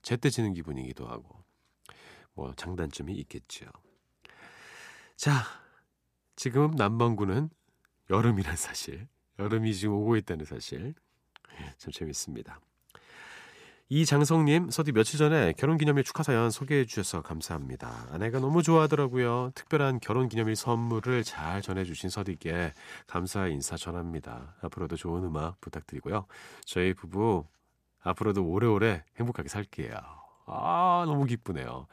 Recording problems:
uneven, jittery; strongly; from 9 to 31 s

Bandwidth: 14.5 kHz